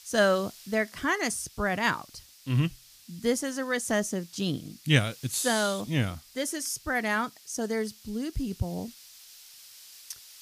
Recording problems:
hiss; faint; throughout; 20 dB below the speech

